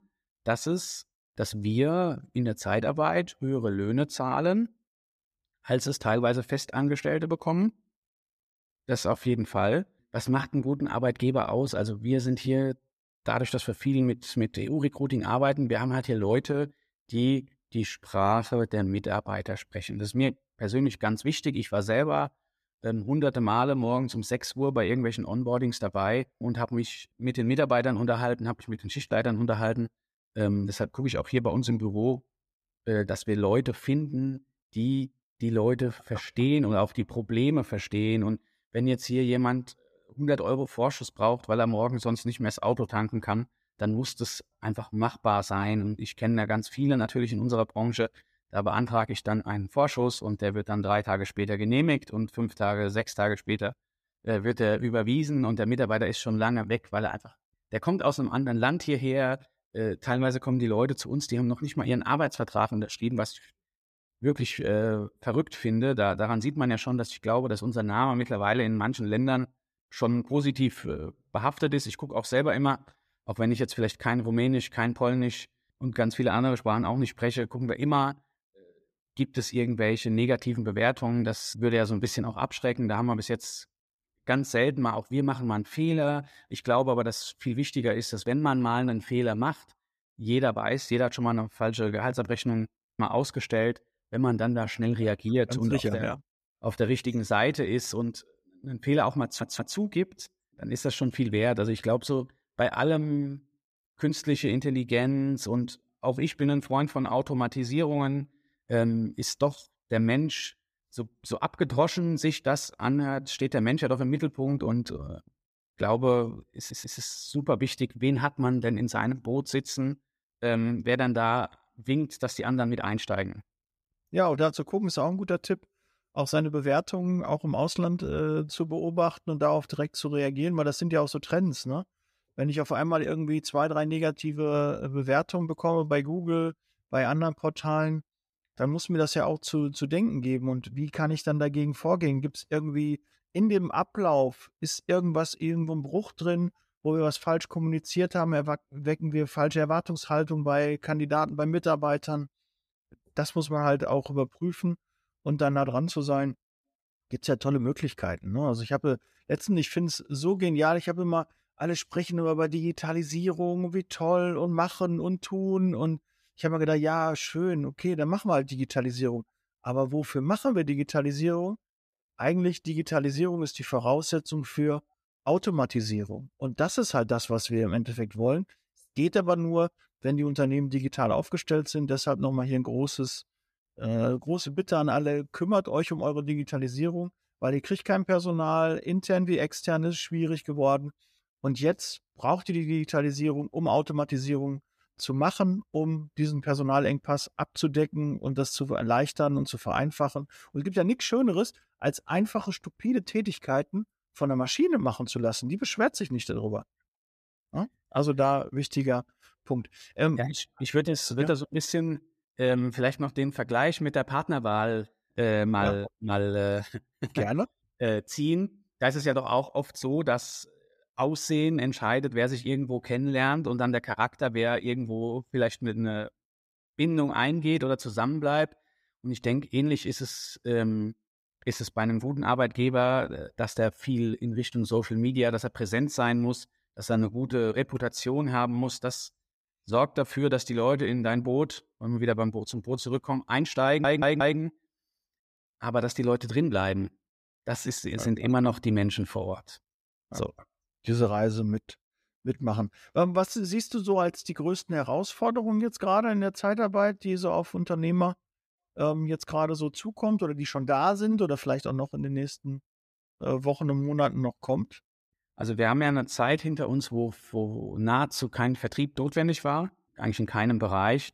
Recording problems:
audio stuttering; at 1:39, at 1:57 and at 4:04

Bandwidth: 14.5 kHz